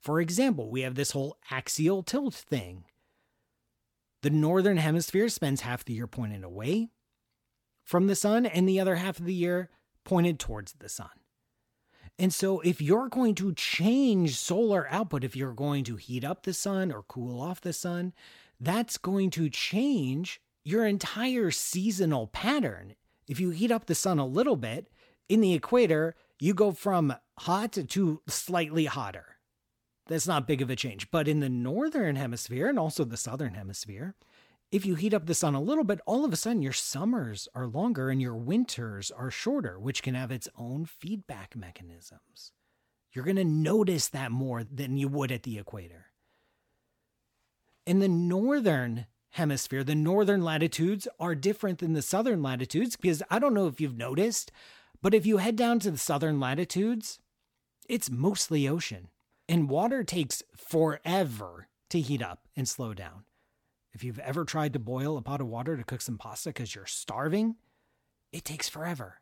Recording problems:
none

